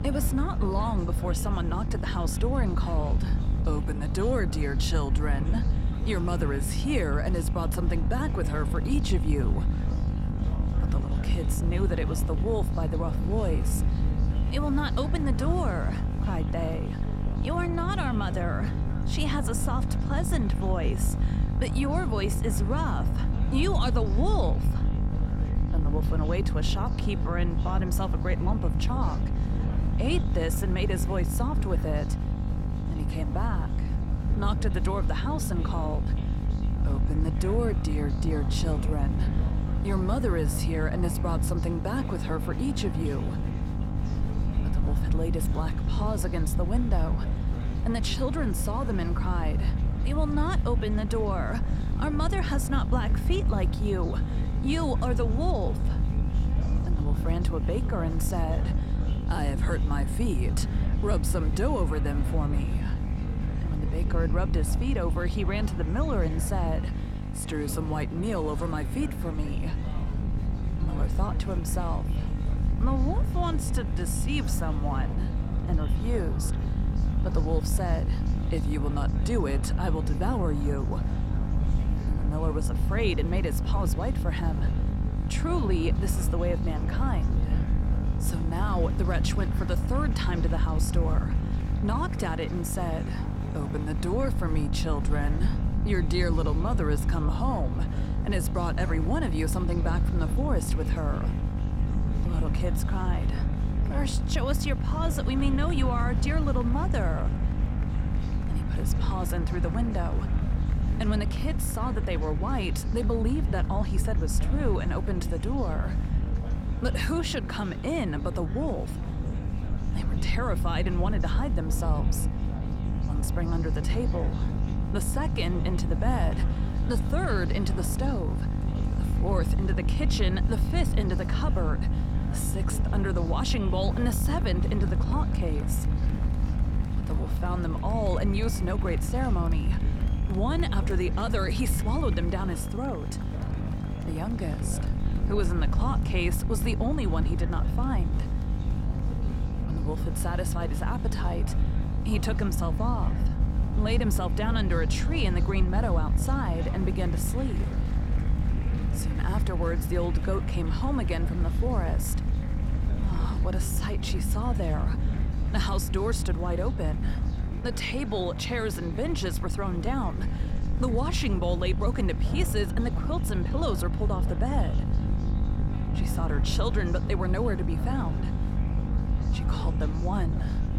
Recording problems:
electrical hum; loud; throughout; 50 Hz, 9 dB below the speech
chatter from many people; noticeable; throughout; 15 dB below the speech
low rumble; noticeable; throughout; 10 dB below the speech

